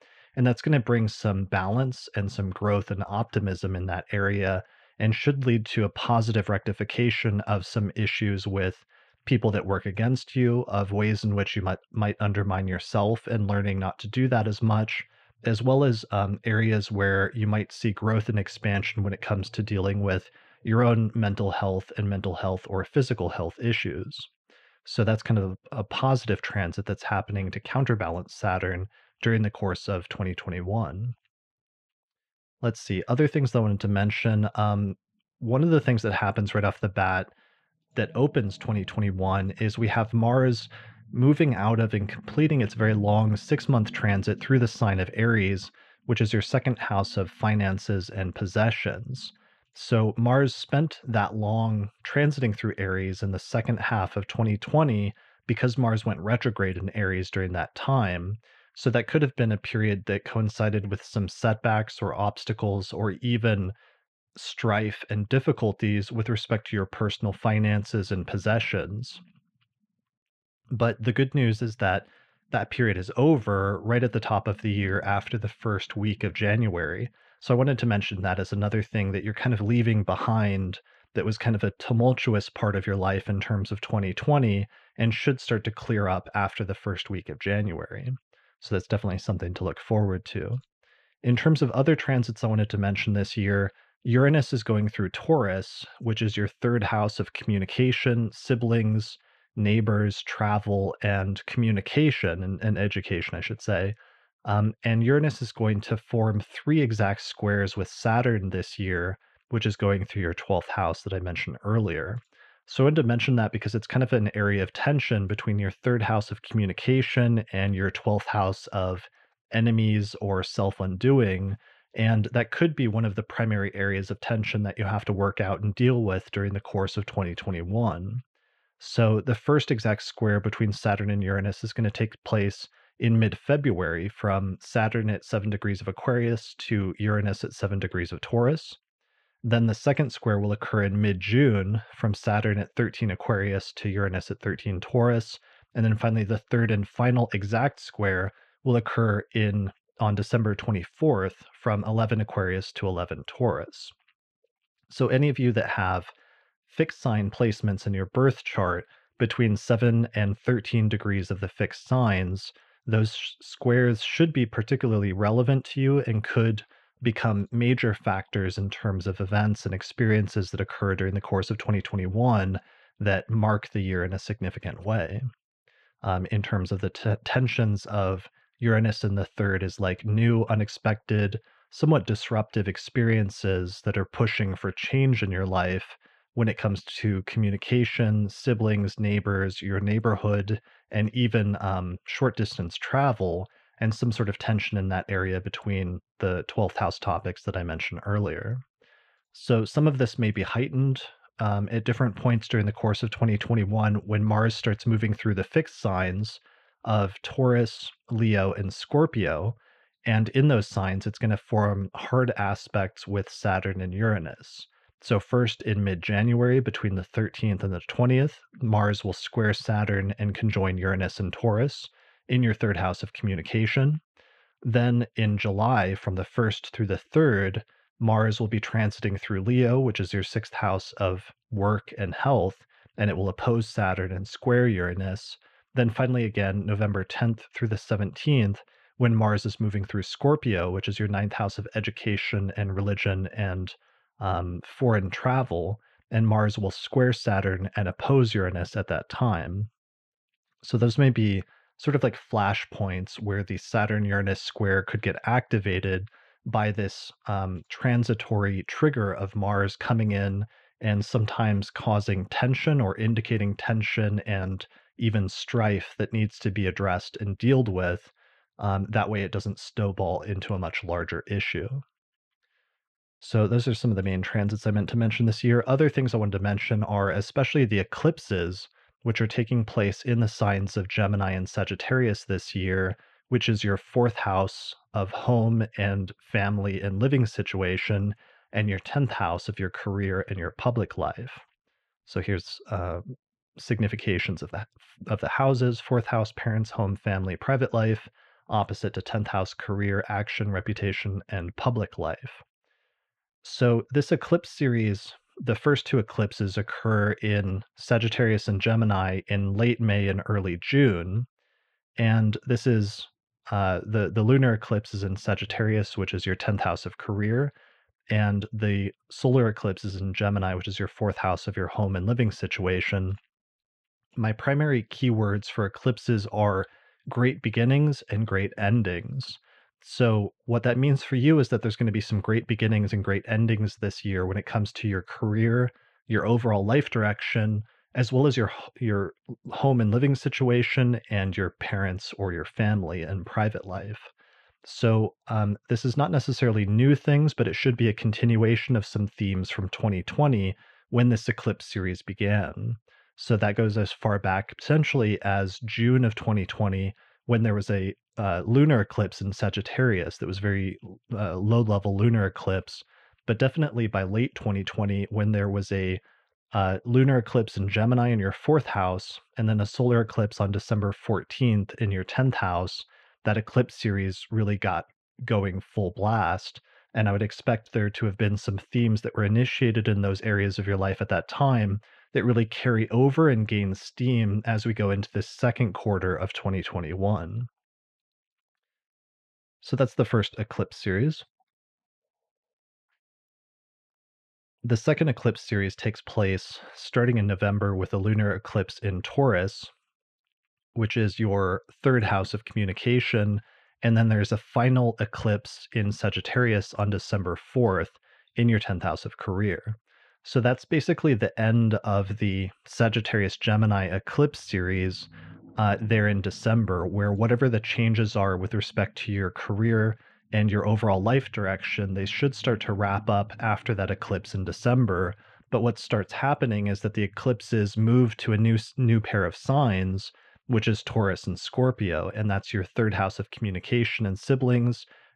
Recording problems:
muffled; slightly; fading above 3 kHz

